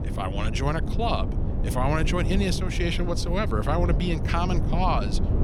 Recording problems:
low rumble; loud; throughout; 9 dB below the speech

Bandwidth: 16.5 kHz